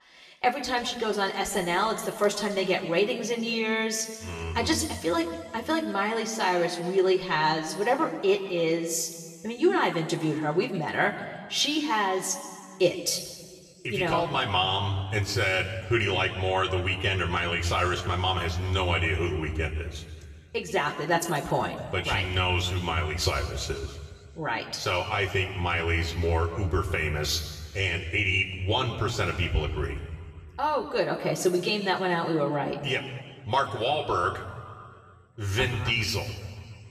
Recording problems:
room echo; slight; dies away in 1.8 s
off-mic speech; somewhat distant

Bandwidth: 14.5 kHz